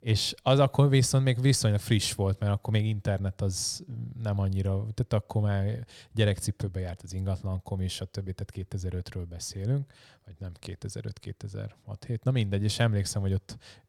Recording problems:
none

